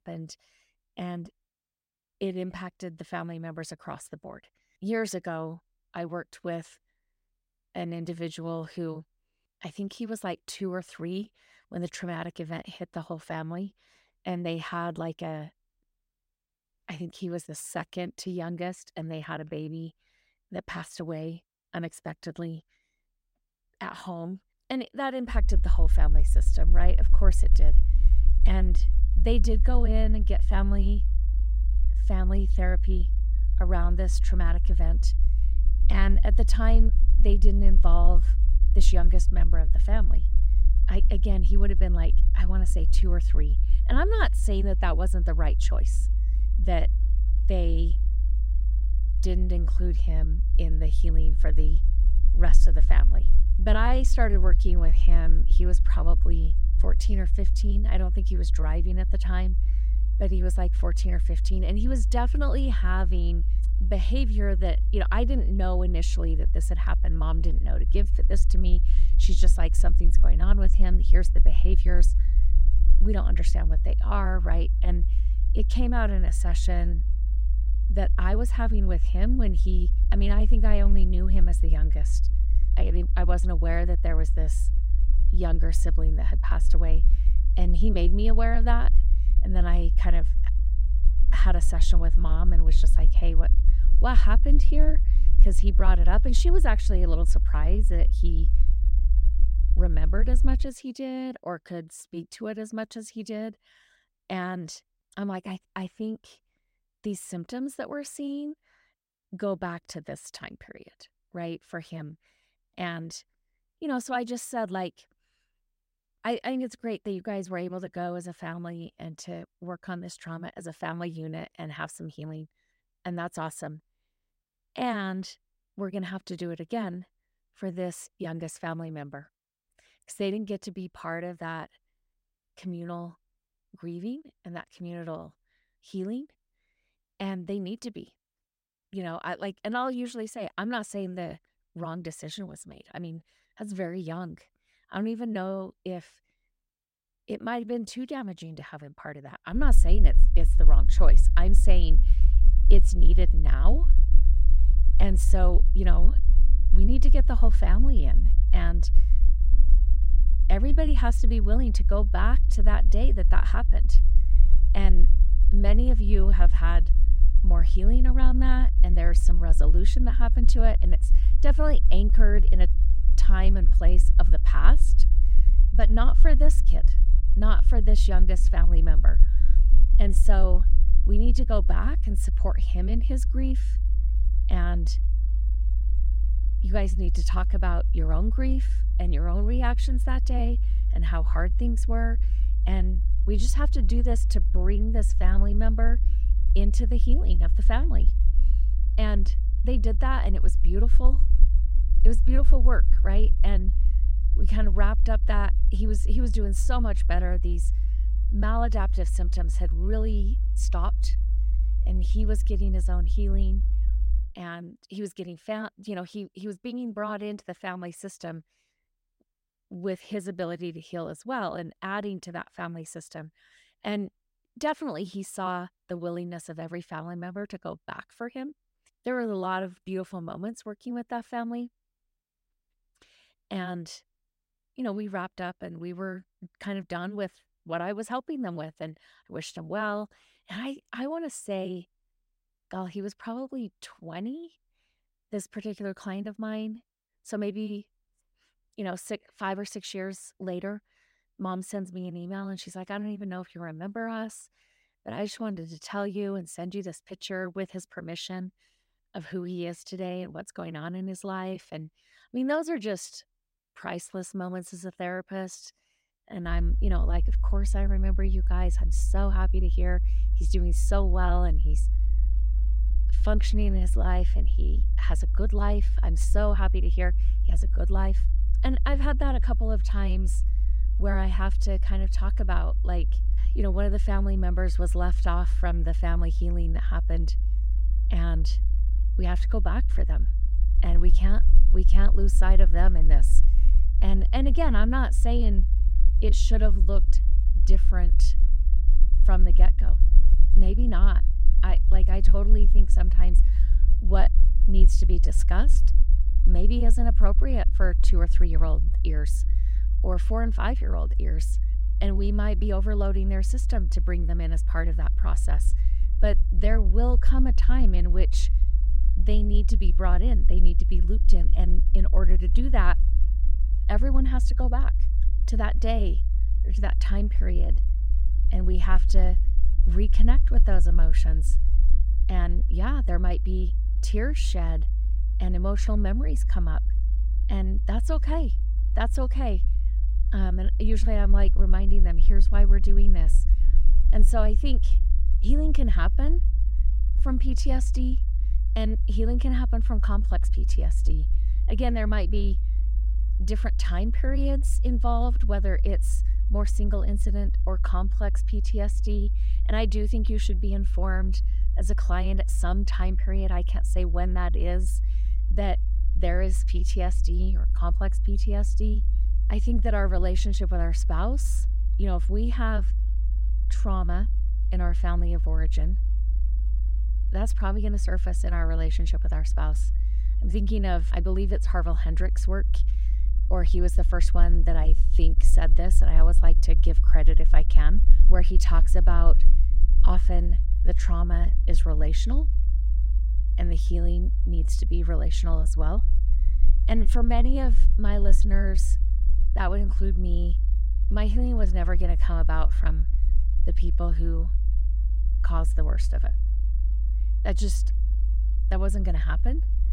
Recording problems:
low rumble; noticeable; from 25 s to 1:41, from 2:30 to 3:34 and from 4:27 on; 15 dB below the speech

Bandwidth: 16 kHz